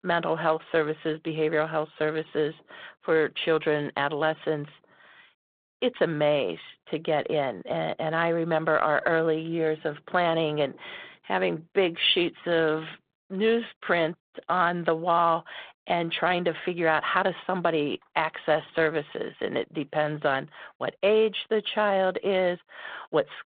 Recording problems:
phone-call audio

